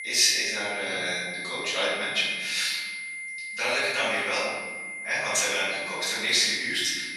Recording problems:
room echo; strong; dies away in 1.5 s
off-mic speech; far
thin; very; fading below 850 Hz
high-pitched whine; loud; throughout; 2 kHz, 8 dB below the speech

